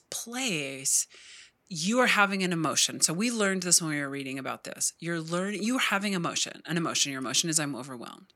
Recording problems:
thin; somewhat; fading below 1 kHz

